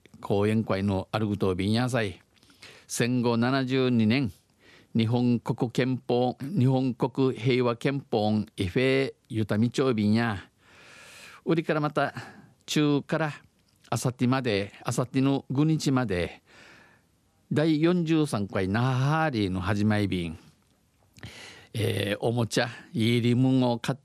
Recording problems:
none

